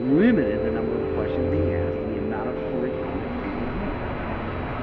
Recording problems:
muffled; very; fading above 2.5 kHz
rain or running water; very loud; throughout; as loud as the speech
chatter from many people; loud; throughout; 10 dB below the speech
high-pitched whine; faint; throughout; 4 kHz, 30 dB below the speech
abrupt cut into speech; at the start

